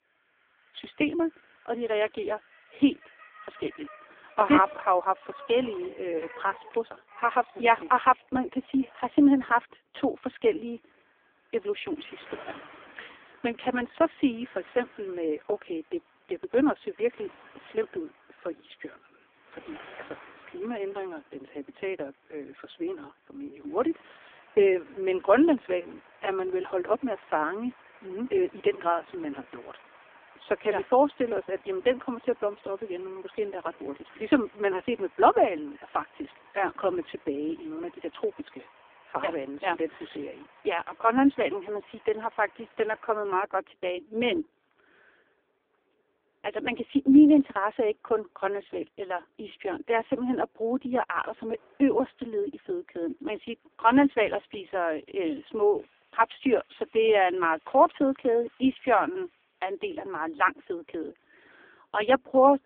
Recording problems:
phone-call audio; poor line
traffic noise; faint; throughout; 25 dB below the speech

